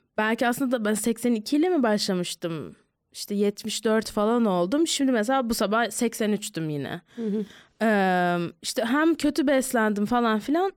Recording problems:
none

